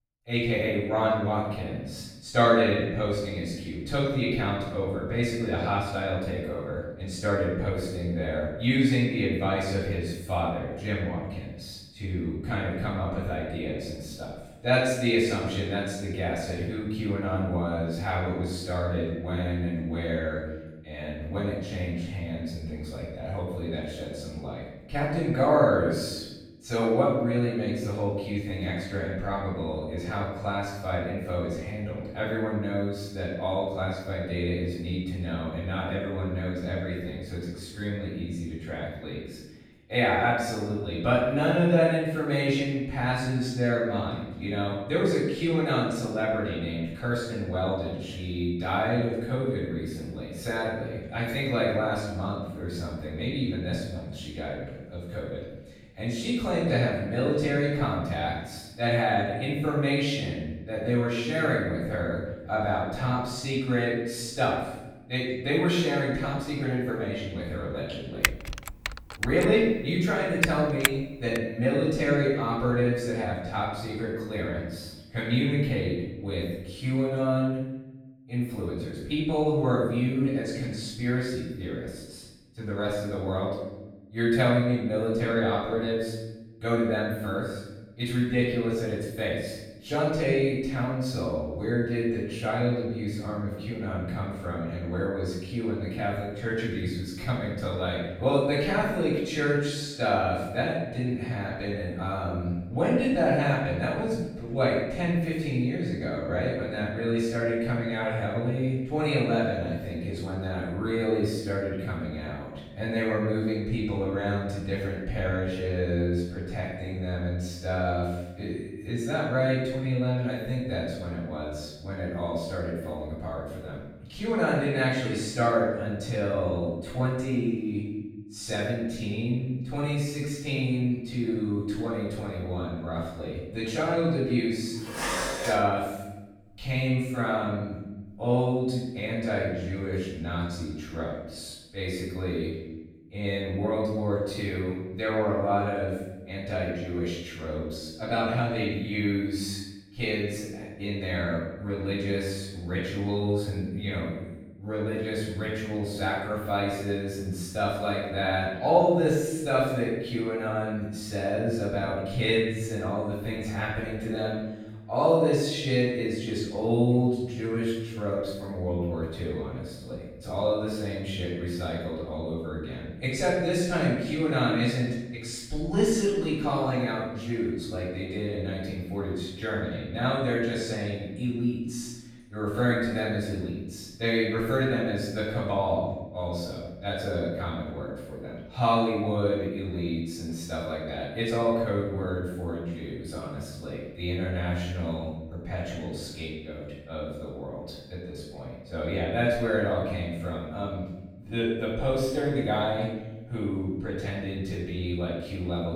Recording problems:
room echo; strong; dies away in 1 s
off-mic speech; far
keyboard typing; loud; from 1:08 to 1:11; peak 3 dB above the speech
clattering dishes; noticeable; at 2:15; peak level with the speech

